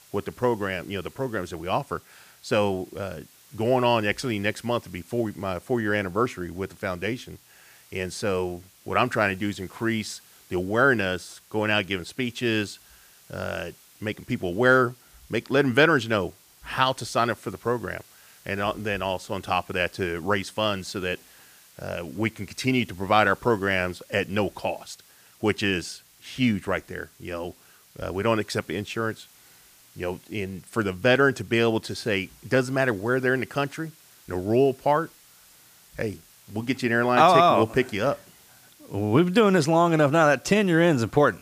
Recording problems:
hiss; faint; throughout; 25 dB below the speech

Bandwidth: 15 kHz